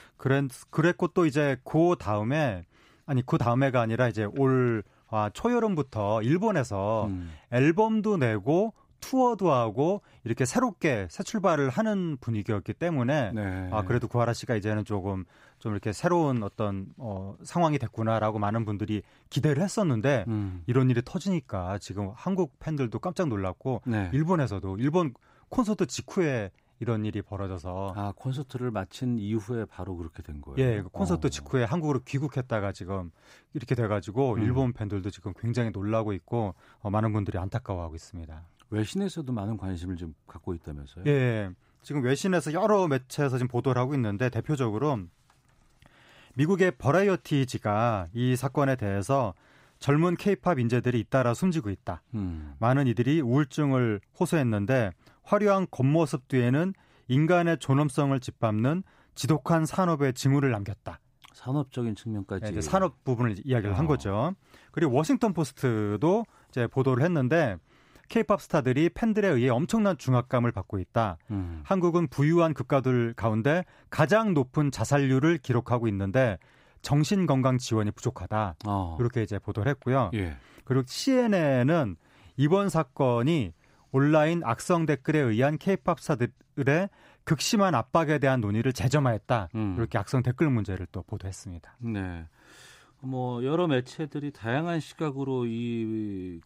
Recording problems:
none

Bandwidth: 15.5 kHz